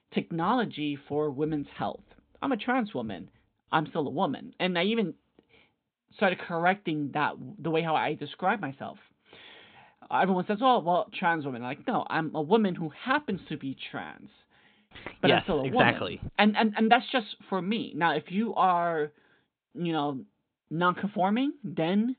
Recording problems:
high frequencies cut off; severe; nothing above 4 kHz

